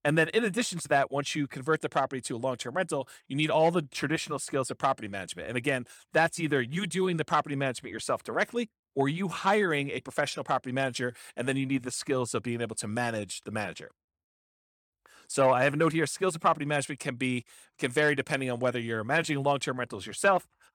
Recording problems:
none

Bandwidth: 18.5 kHz